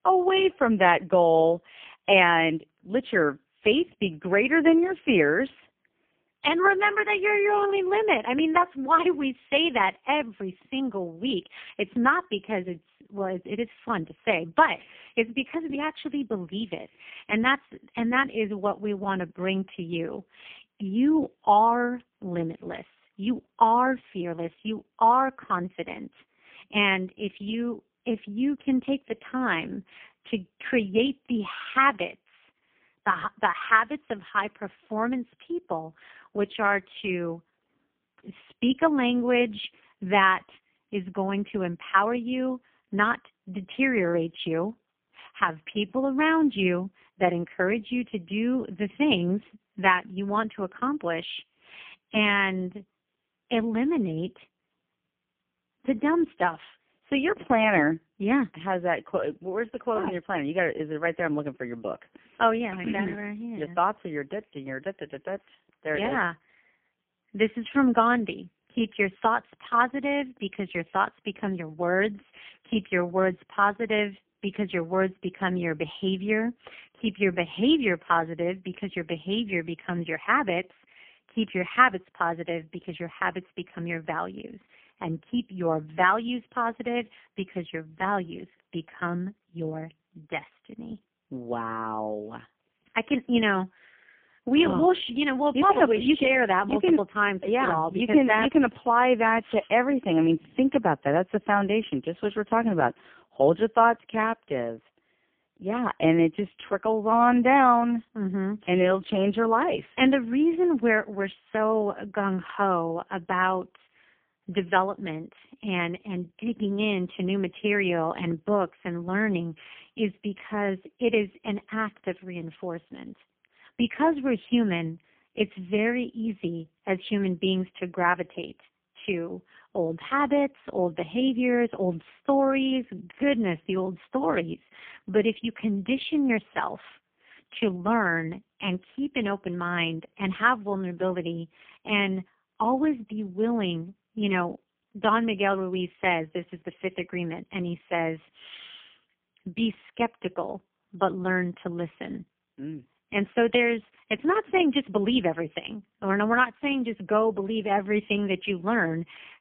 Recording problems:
phone-call audio; poor line; nothing above 3.5 kHz

